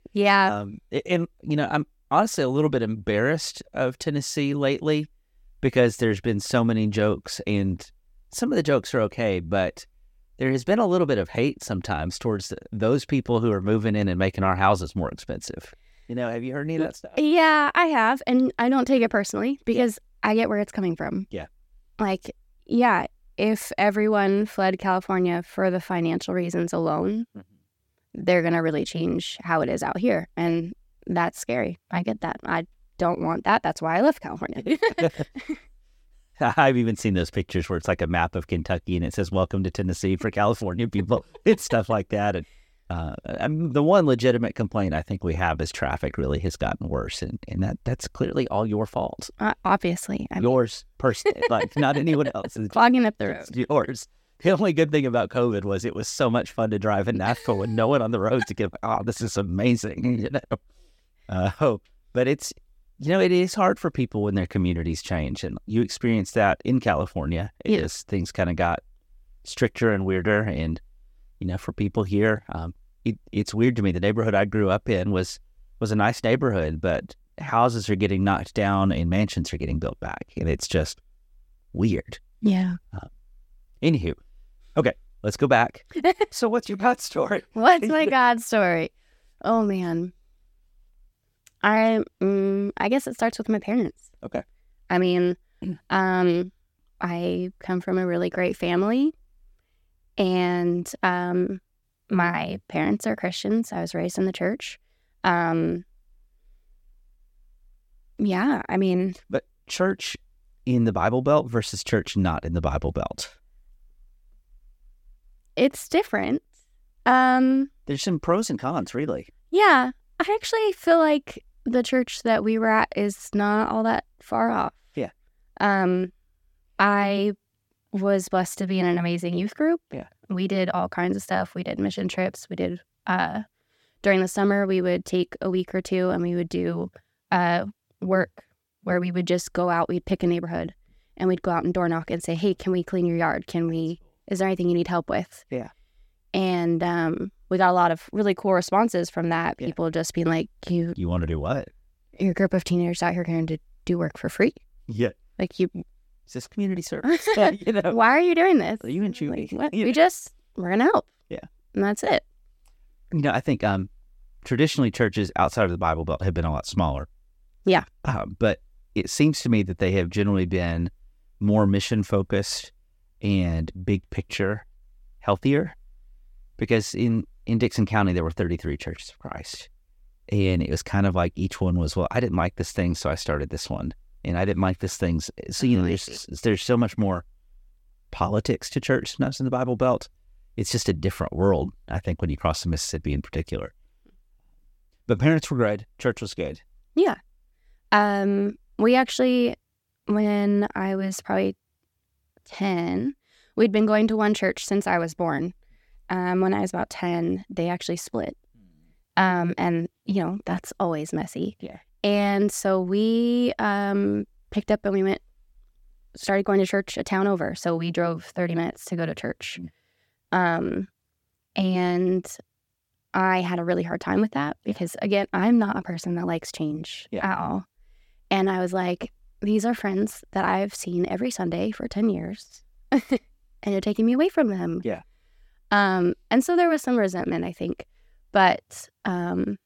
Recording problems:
none

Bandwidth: 17 kHz